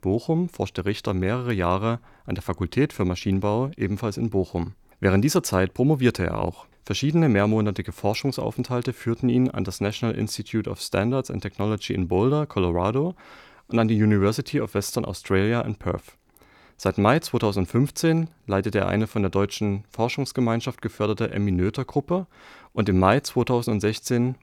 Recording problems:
none

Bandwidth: 18.5 kHz